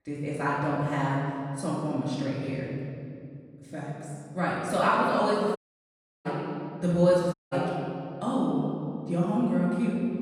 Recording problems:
room echo; strong; dies away in 2.3 s
off-mic speech; far
audio cutting out; at 5.5 s for 0.5 s and at 7.5 s

